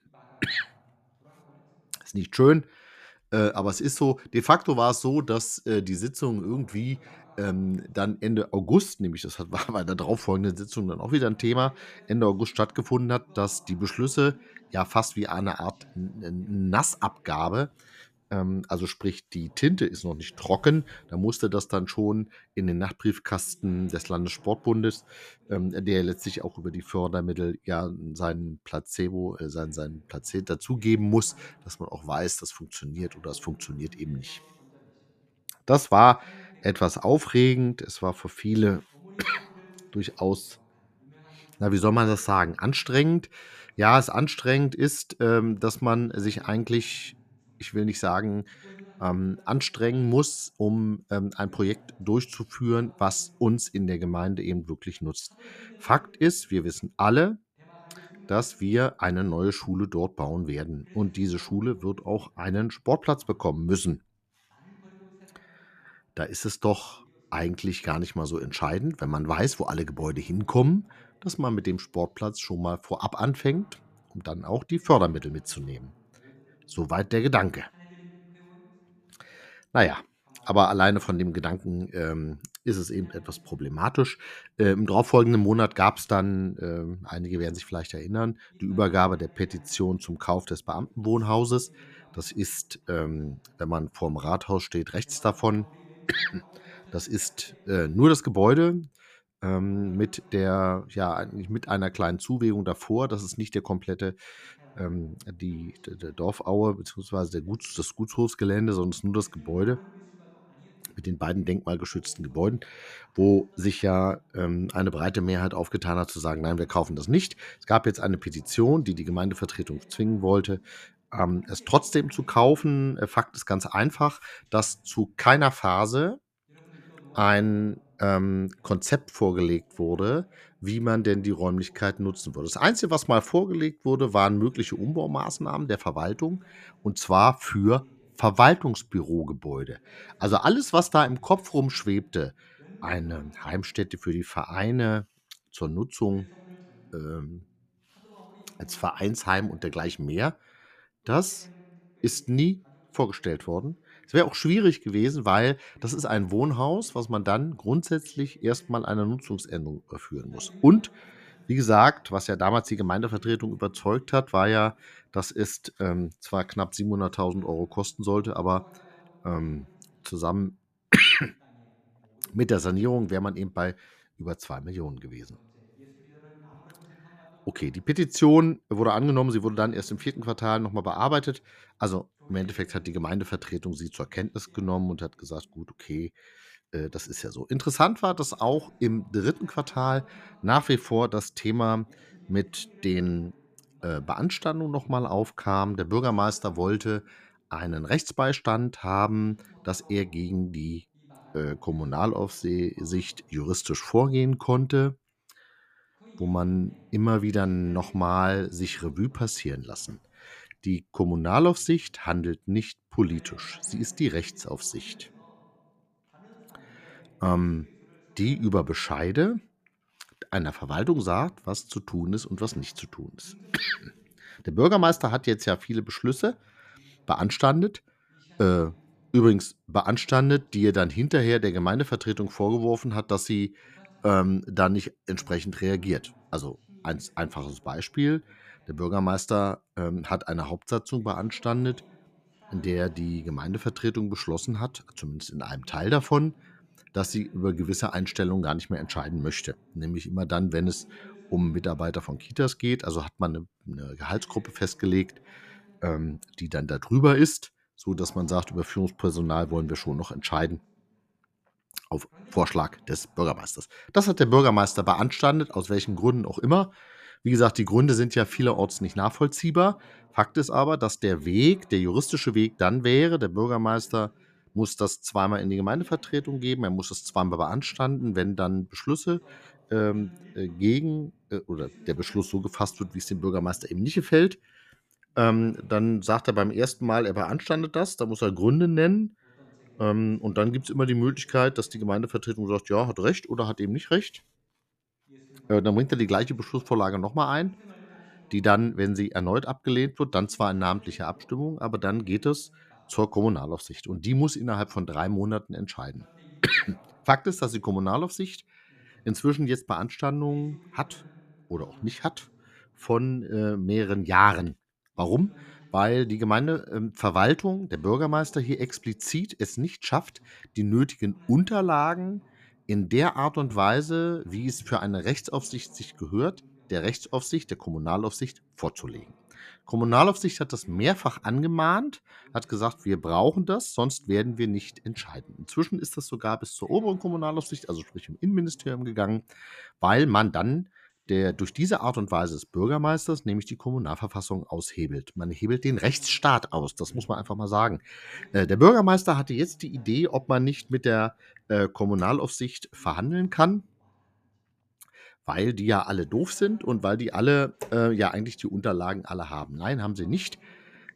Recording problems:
voice in the background; faint; throughout; 30 dB below the speech

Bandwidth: 14.5 kHz